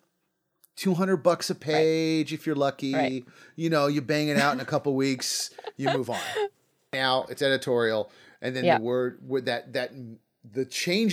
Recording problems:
abrupt cut into speech; at the end

